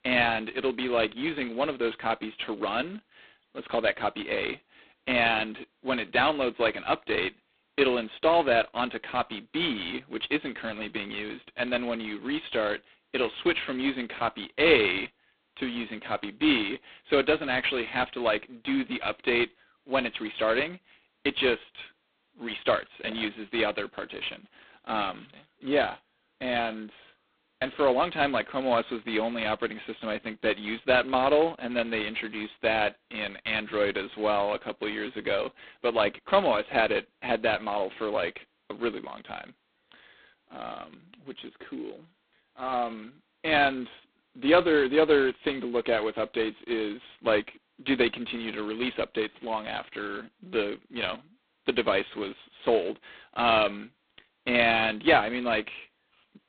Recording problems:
phone-call audio; poor line; nothing above 4 kHz

